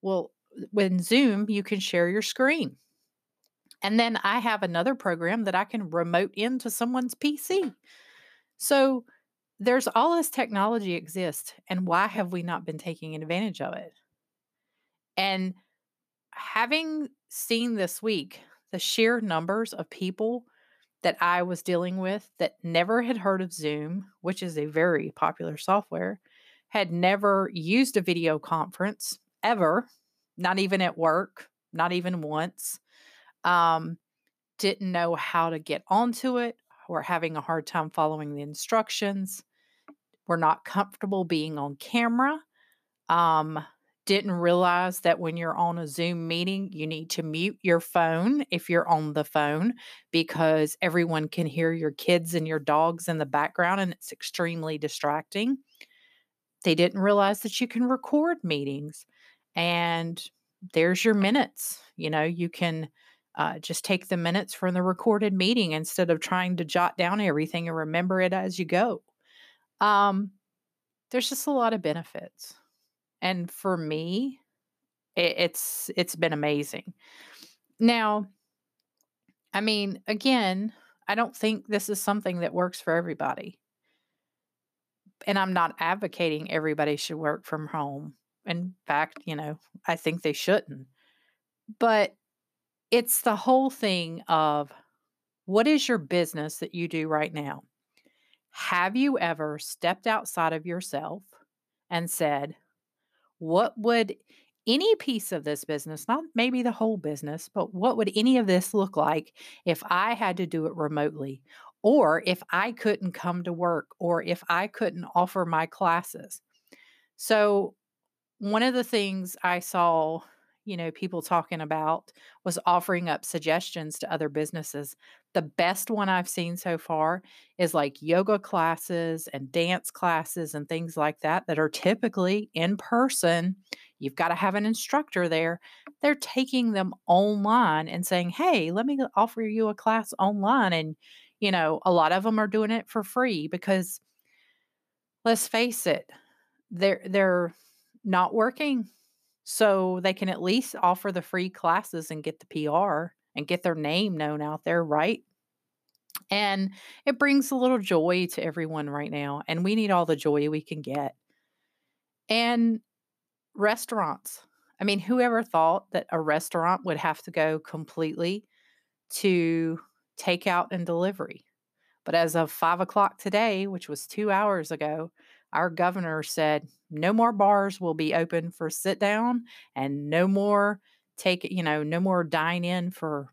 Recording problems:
none

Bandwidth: 14.5 kHz